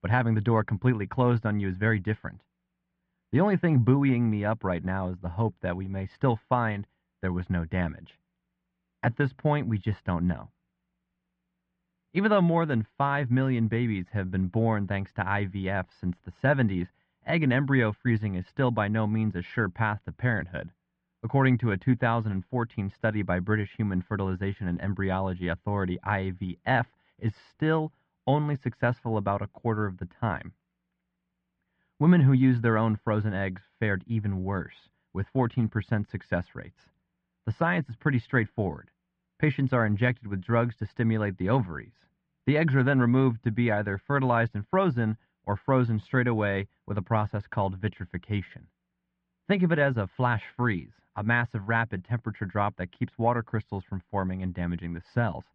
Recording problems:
muffled; very; fading above 2.5 kHz

